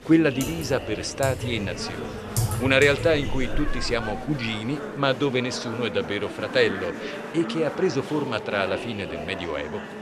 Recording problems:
household noises; loud; until 4 s; 8 dB below the speech
murmuring crowd; loud; throughout; 9 dB below the speech

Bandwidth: 14 kHz